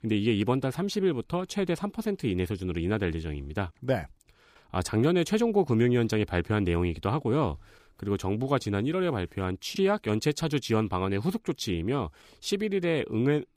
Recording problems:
none

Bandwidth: 15 kHz